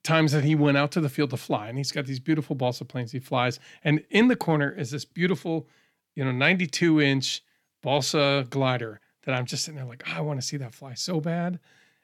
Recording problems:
none

